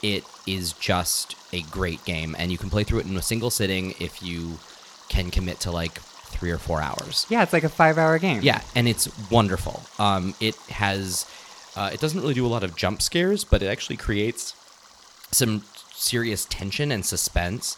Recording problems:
rain or running water; faint; throughout; 20 dB below the speech

